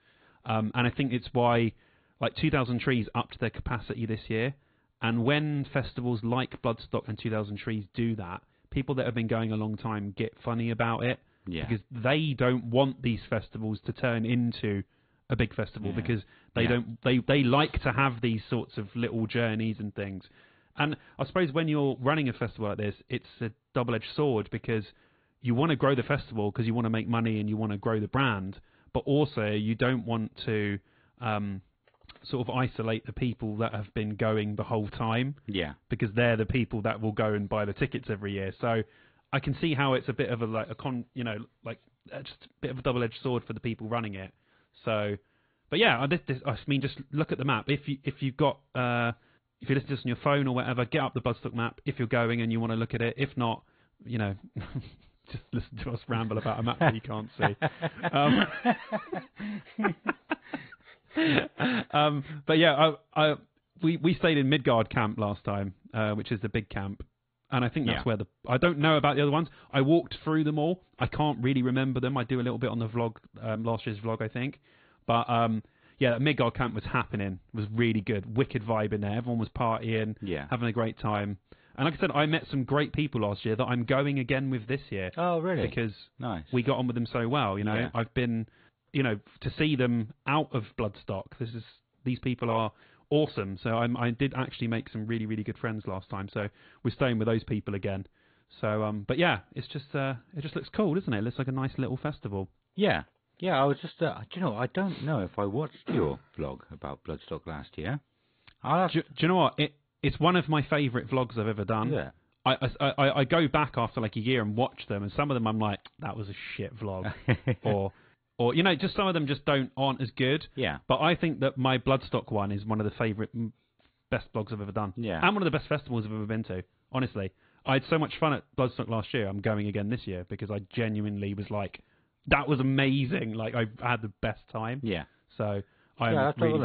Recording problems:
high frequencies cut off; severe; nothing above 4 kHz
garbled, watery; slightly
abrupt cut into speech; at the end

